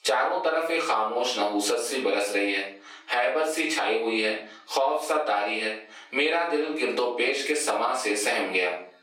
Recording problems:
off-mic speech; far
squashed, flat; heavily
thin; somewhat; fading below 350 Hz
room echo; slight; dies away in 0.4 s

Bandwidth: 16.5 kHz